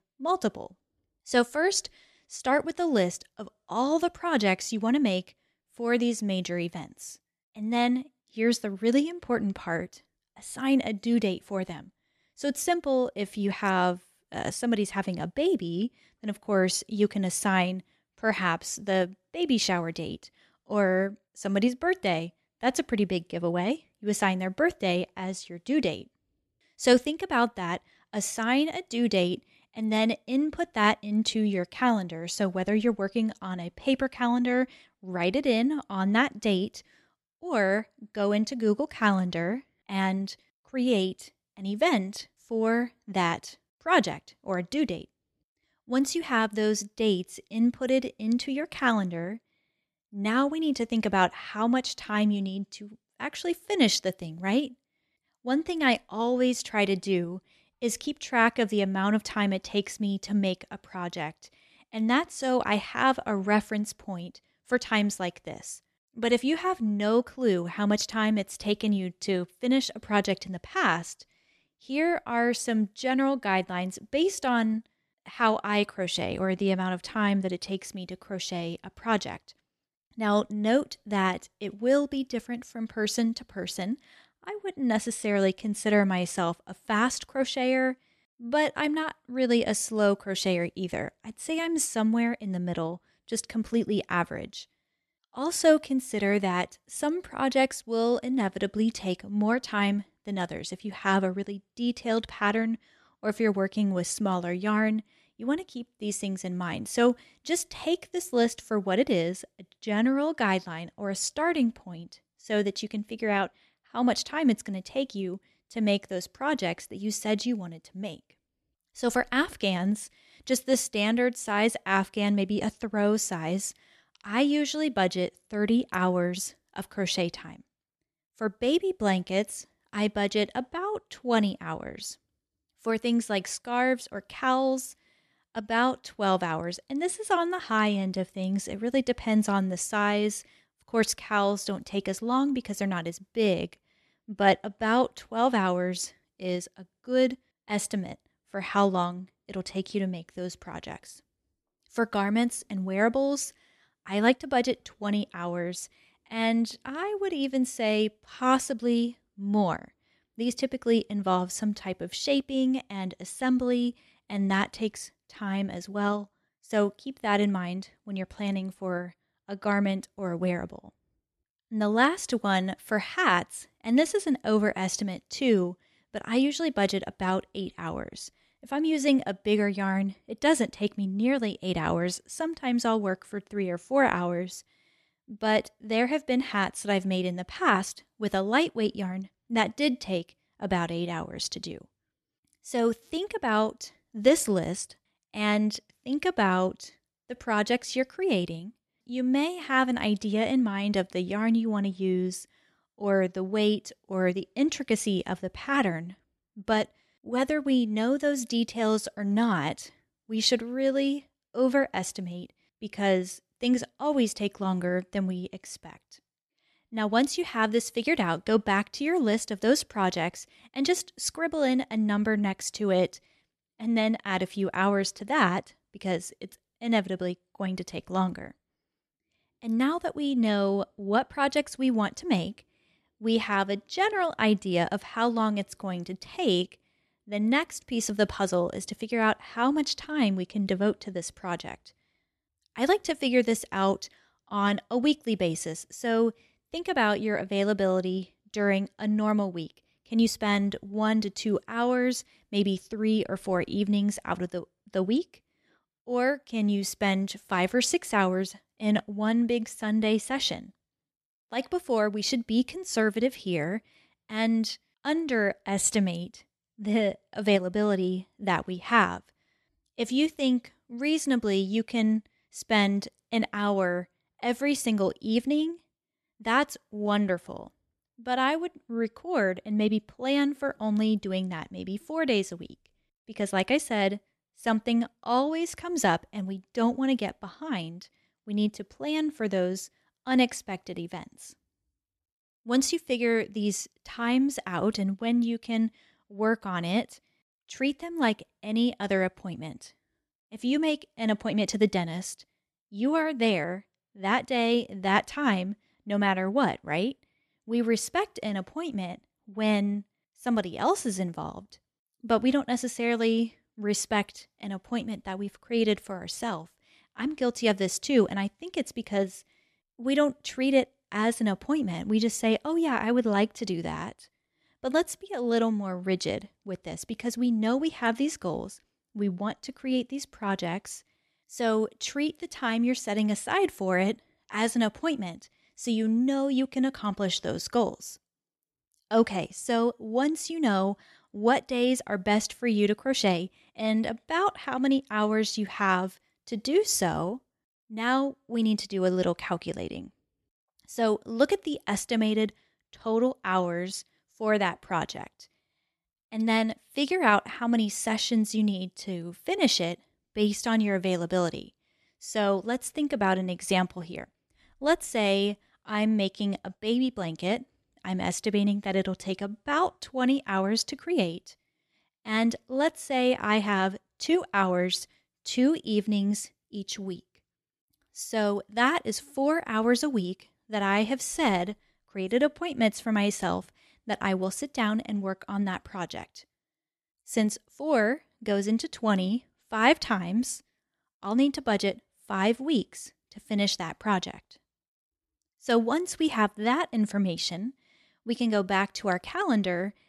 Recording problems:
none

